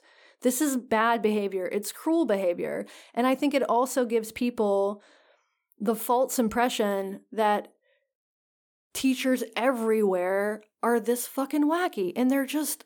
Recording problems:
none

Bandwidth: 18.5 kHz